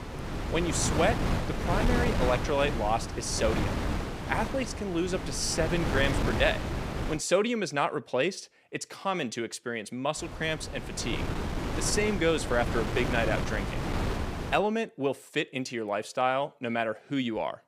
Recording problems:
wind noise on the microphone; heavy; until 7 s and from 10 to 15 s; 5 dB below the speech

